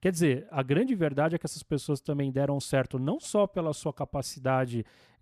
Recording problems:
none

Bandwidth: 14 kHz